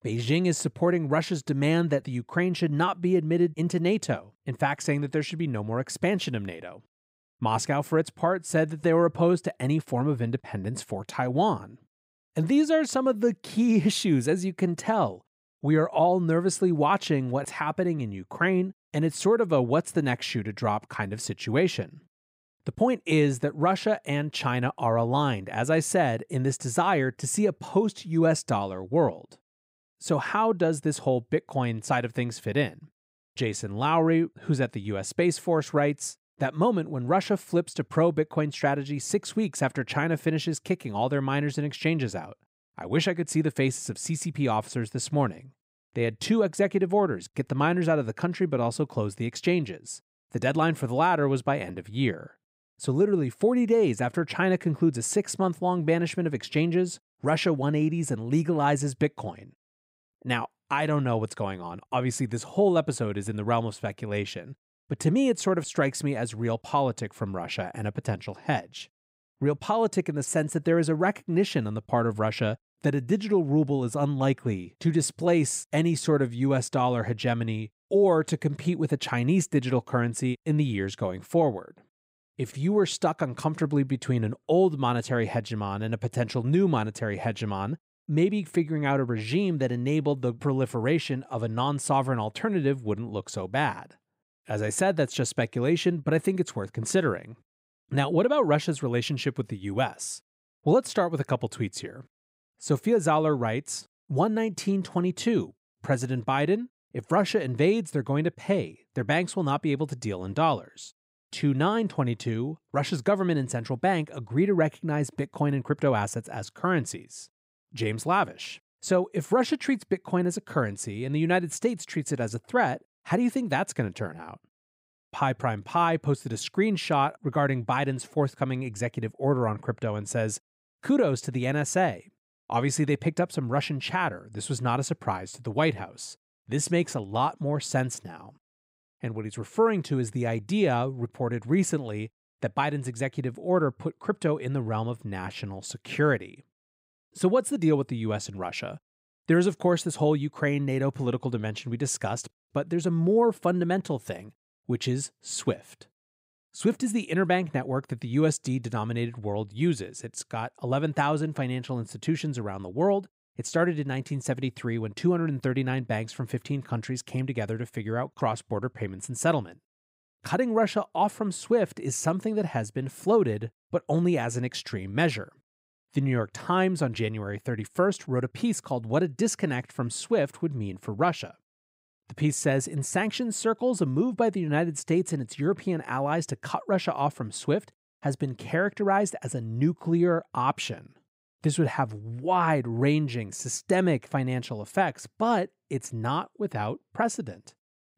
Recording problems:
none

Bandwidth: 15.5 kHz